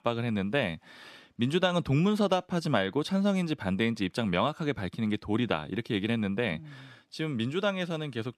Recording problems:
none

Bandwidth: 14 kHz